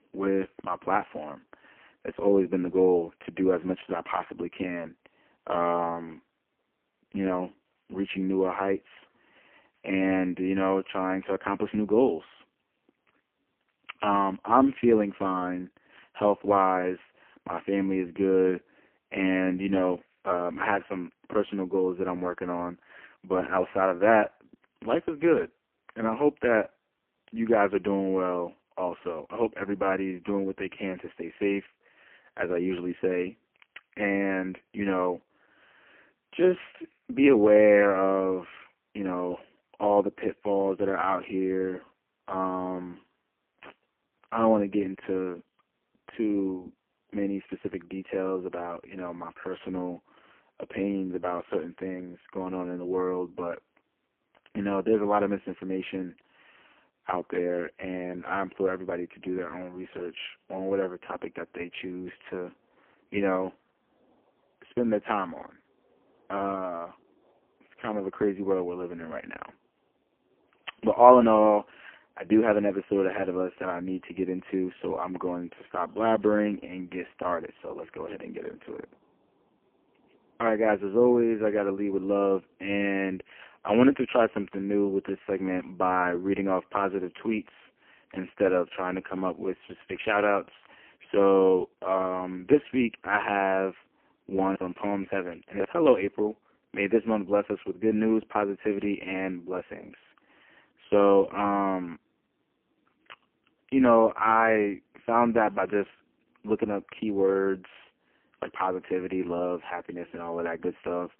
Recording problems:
phone-call audio; poor line

